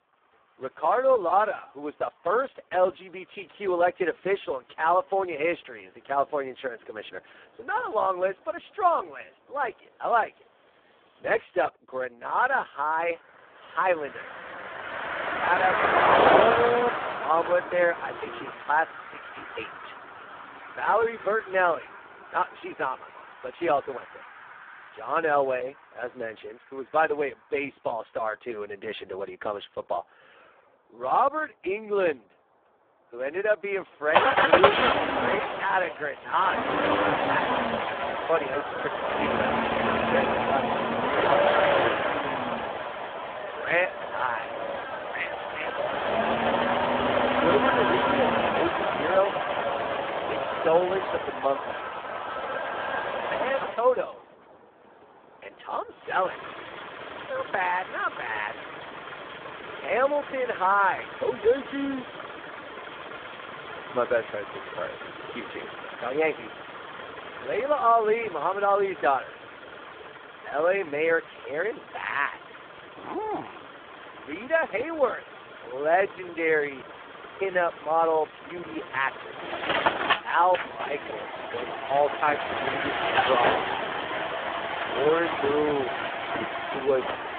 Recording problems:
phone-call audio; poor line
traffic noise; loud; throughout; 1 dB below the speech

